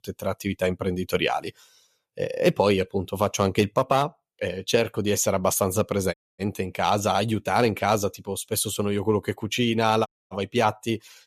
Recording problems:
audio cutting out; at 6 s and at 10 s

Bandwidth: 14.5 kHz